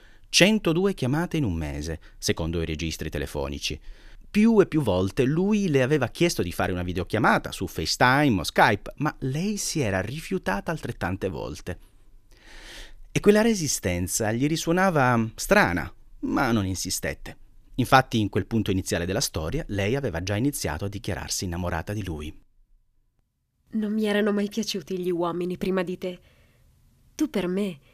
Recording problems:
none

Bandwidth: 14.5 kHz